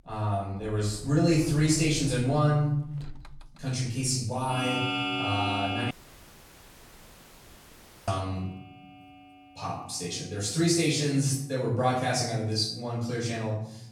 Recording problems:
off-mic speech; far
room echo; noticeable; dies away in 0.8 s
household noises; loud; throughout; 5 dB below the speech
audio cutting out; at 6 s for 2 s

